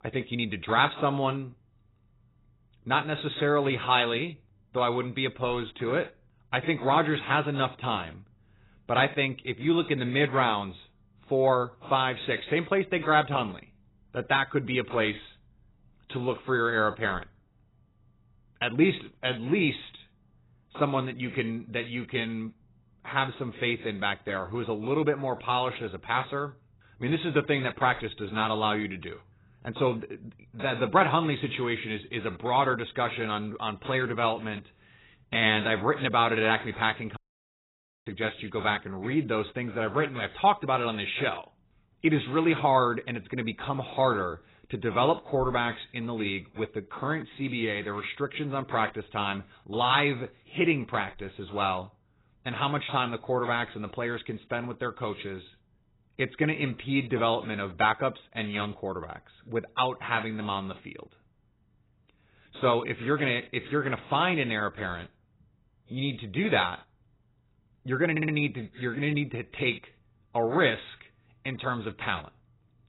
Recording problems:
garbled, watery; badly; nothing above 4 kHz
audio cutting out; at 37 s for 1 s
audio stuttering; at 1:08

